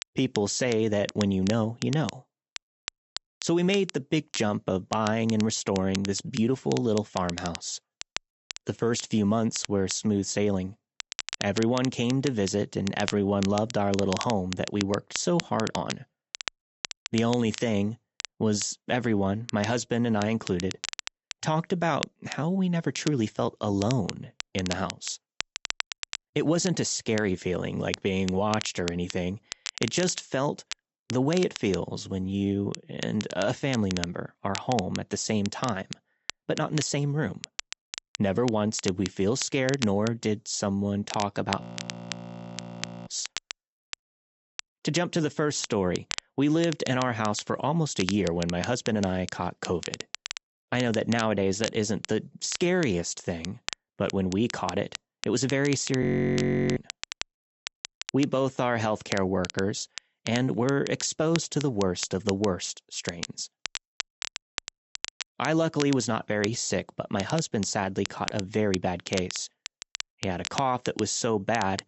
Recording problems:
high frequencies cut off; noticeable; nothing above 7.5 kHz
crackle, like an old record; noticeable; 10 dB below the speech
audio freezing; at 42 s for 1.5 s and at 56 s for 0.5 s

